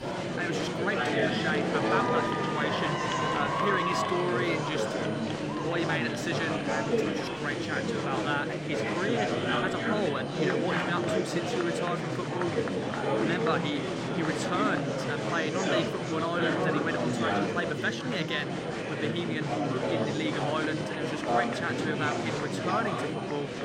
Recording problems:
murmuring crowd; very loud; throughout; 3 dB above the speech
high-pitched whine; noticeable; throughout; 3 kHz, 20 dB below the speech

